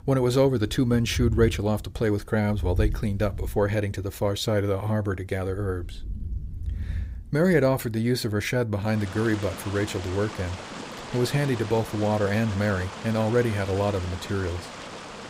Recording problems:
rain or running water; noticeable; throughout; 10 dB below the speech

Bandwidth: 15.5 kHz